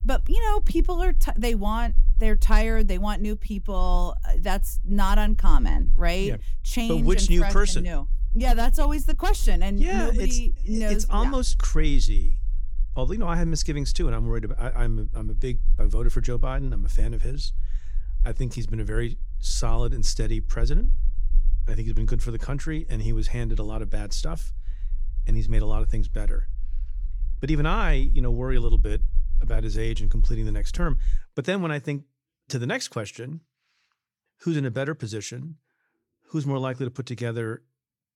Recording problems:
low rumble; faint; until 31 s; 25 dB below the speech

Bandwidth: 17.5 kHz